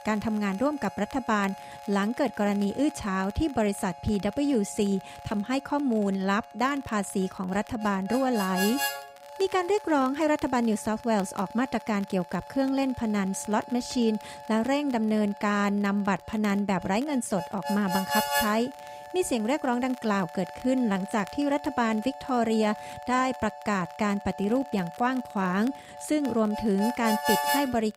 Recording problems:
background music; loud; throughout; 9 dB below the speech
crackle, like an old record; faint; 25 dB below the speech

